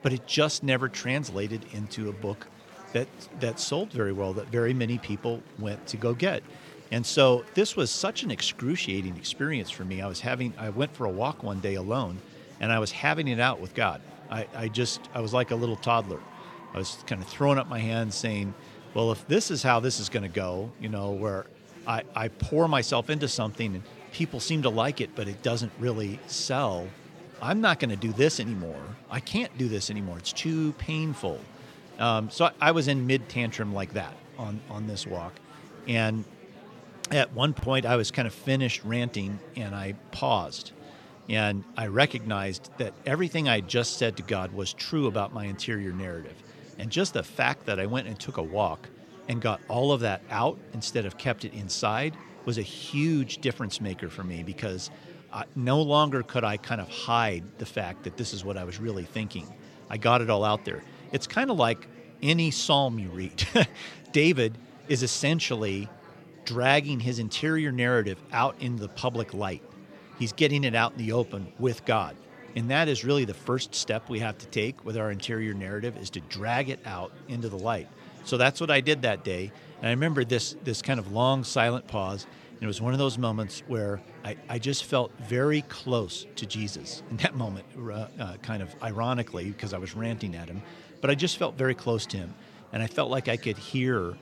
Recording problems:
murmuring crowd; noticeable; throughout; 20 dB below the speech

